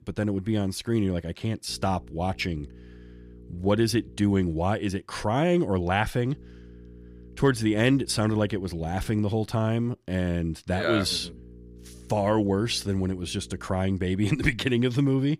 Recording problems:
electrical hum; faint; from 1.5 to 4.5 s, from 6.5 to 9 s and from 11 to 14 s; 60 Hz, 25 dB below the speech

